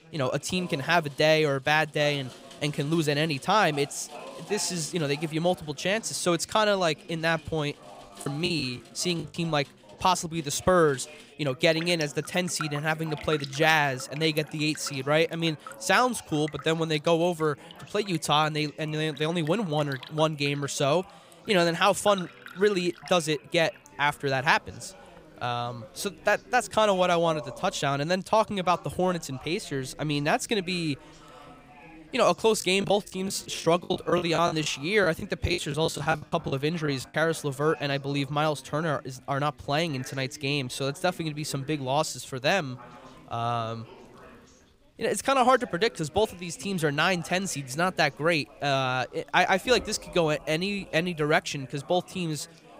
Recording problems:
rain or running water; faint; throughout; 20 dB below the speech
chatter from many people; faint; throughout; 20 dB below the speech
choppy; very; from 8 to 9.5 s and from 33 to 37 s; 19% of the speech affected

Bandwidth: 15.5 kHz